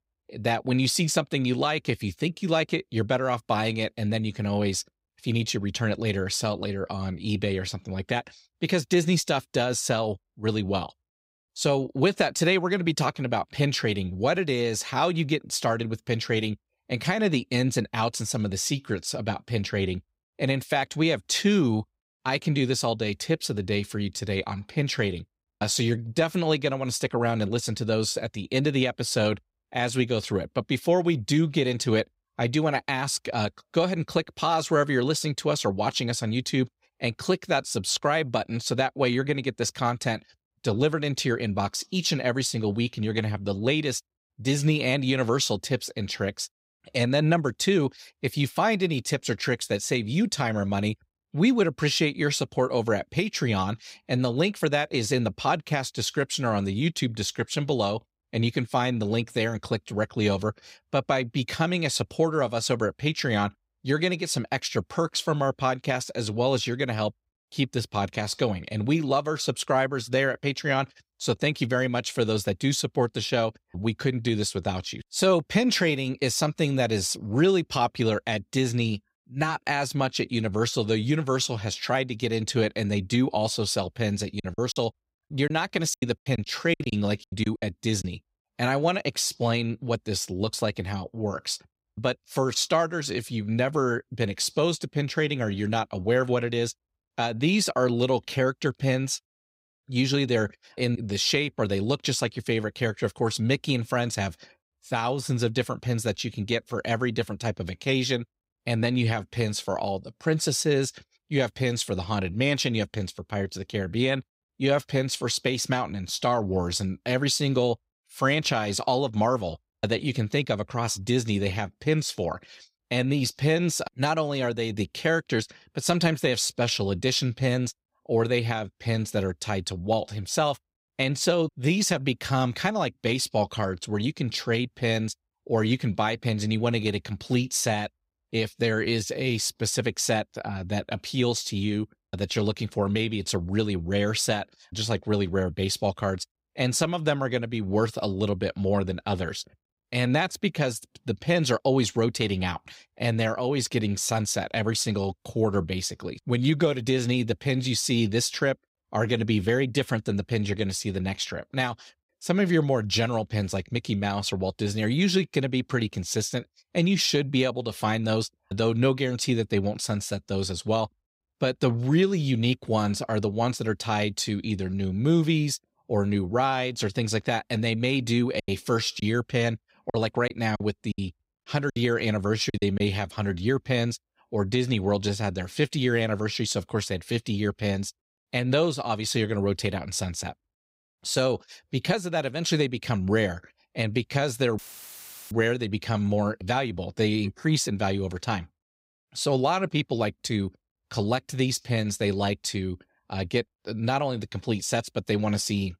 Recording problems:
choppy; very; from 1:24 to 1:28 and from 2:58 to 3:03; 14% of the speech affected
audio cutting out; filled with static; at 3:15 for 0.5 s

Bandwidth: 15.5 kHz